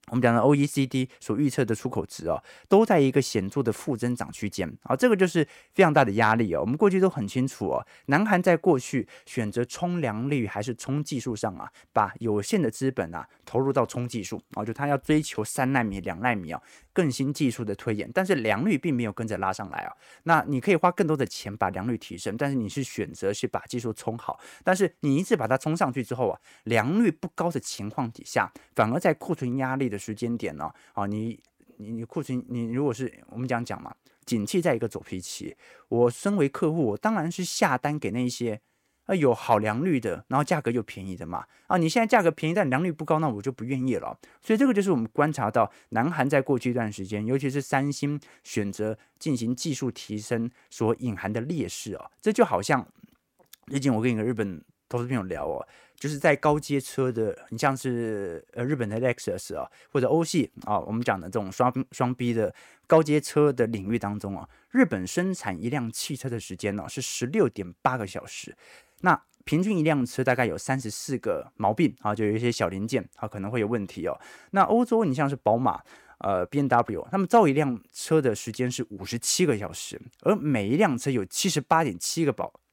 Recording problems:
none

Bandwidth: 16.5 kHz